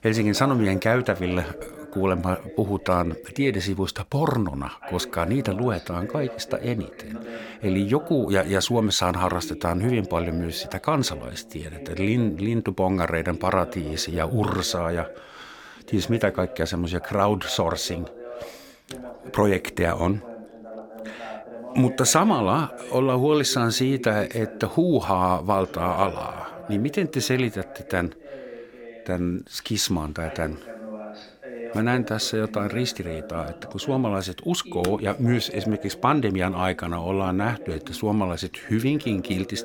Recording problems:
voice in the background; noticeable; throughout; 15 dB below the speech

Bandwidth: 17 kHz